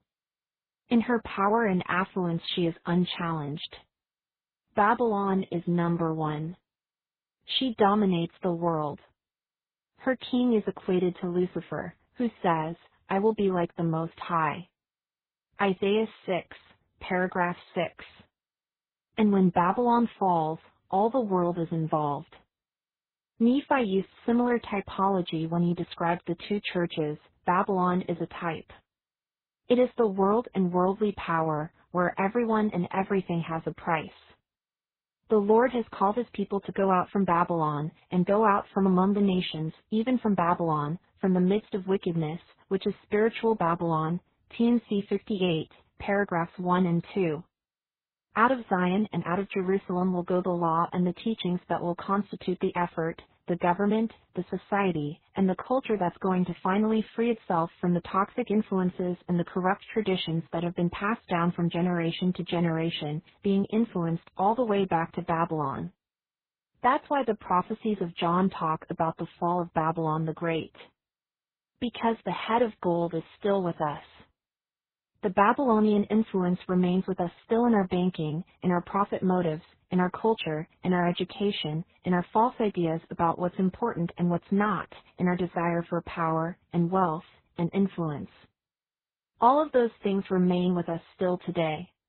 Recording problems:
garbled, watery; badly; nothing above 4 kHz

